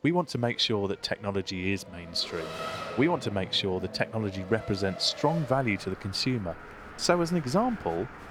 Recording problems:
traffic noise; noticeable; throughout; 15 dB below the speech
murmuring crowd; faint; throughout; 25 dB below the speech

